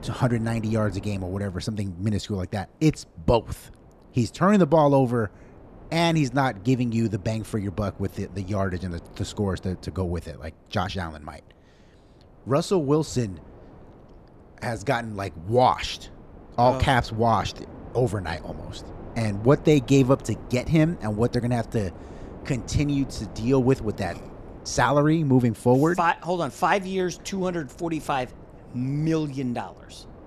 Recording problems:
wind noise on the microphone; occasional gusts; 20 dB below the speech

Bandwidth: 13.5 kHz